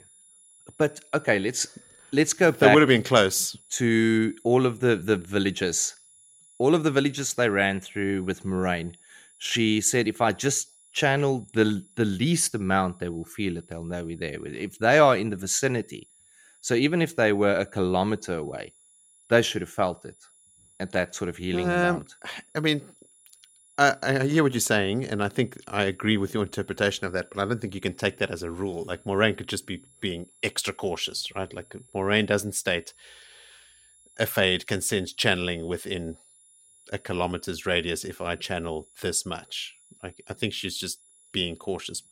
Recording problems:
high-pitched whine; faint; throughout; 10.5 kHz, 30 dB below the speech

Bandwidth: 16 kHz